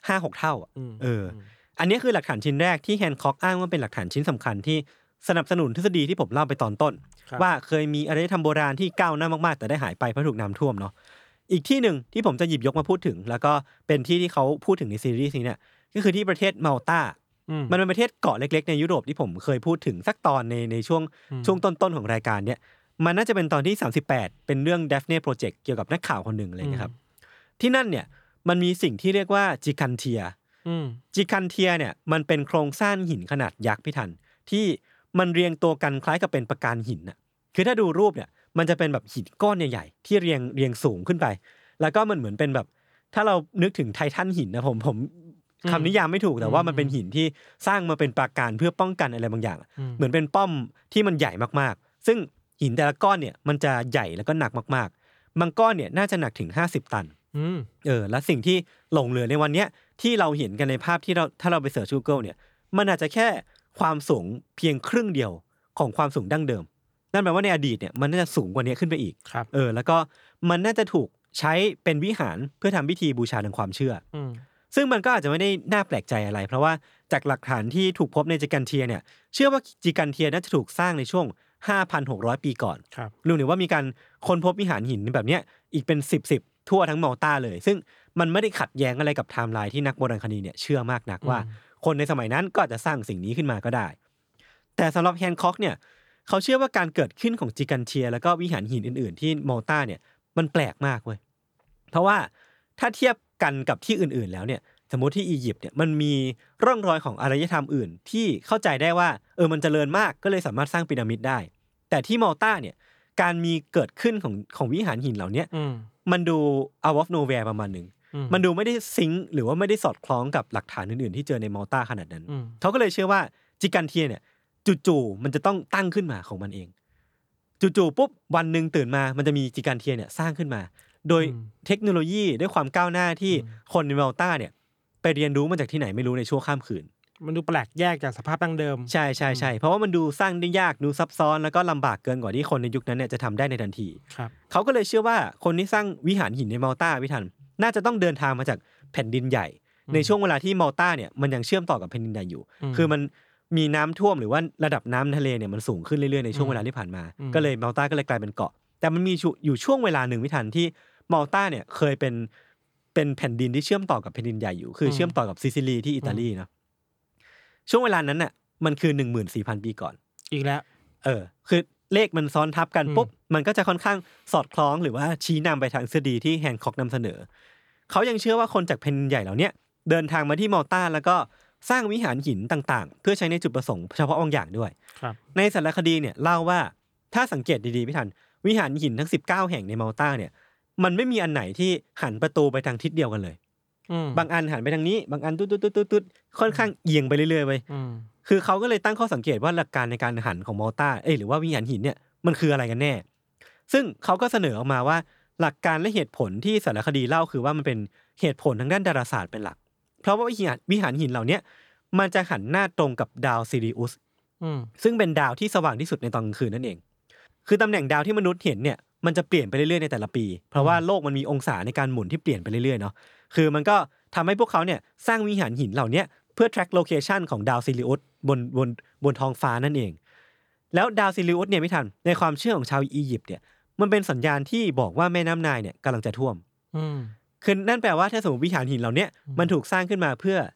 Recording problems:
none

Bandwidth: 18.5 kHz